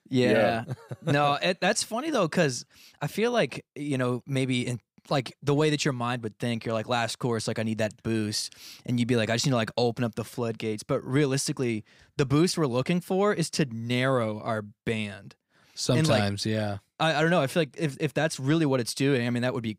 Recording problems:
none

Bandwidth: 15.5 kHz